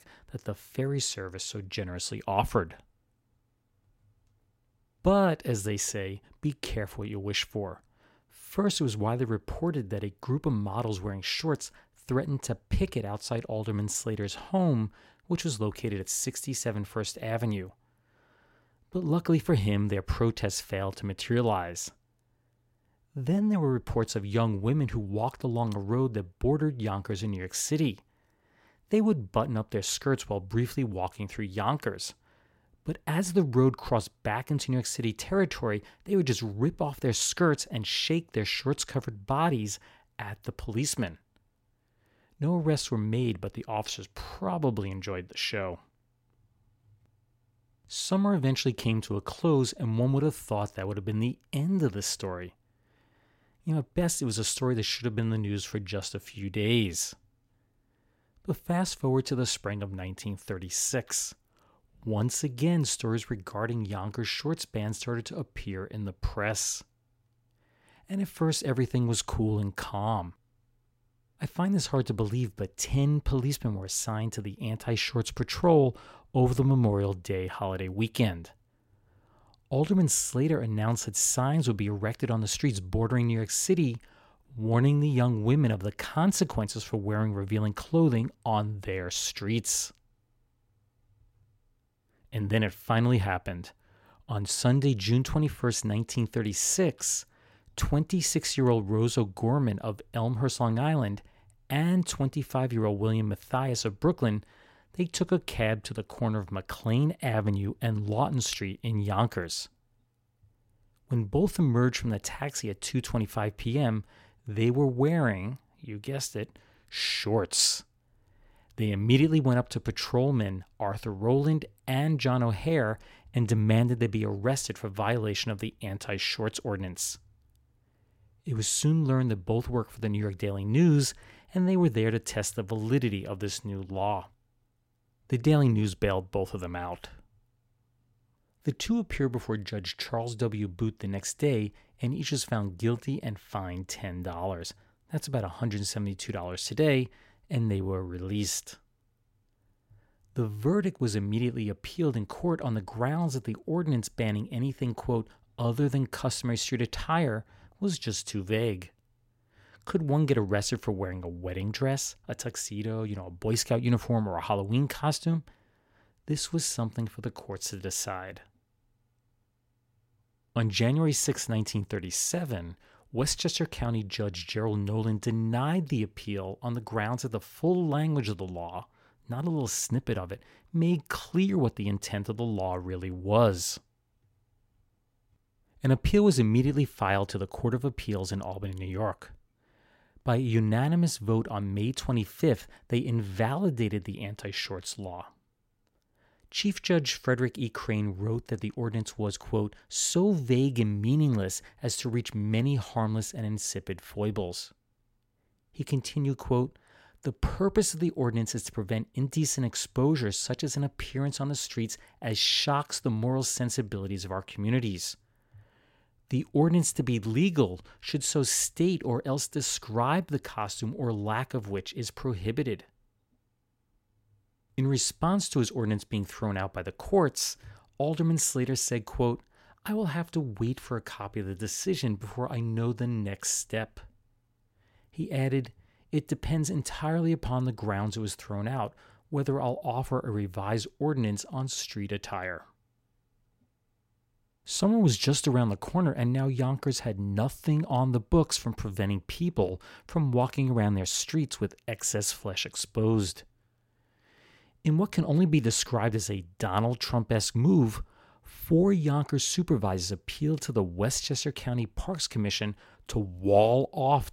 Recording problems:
none

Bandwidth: 16 kHz